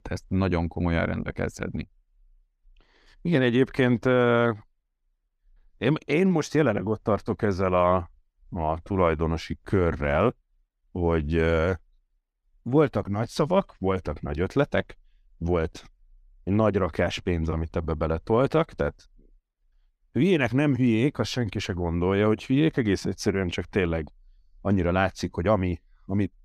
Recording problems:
none

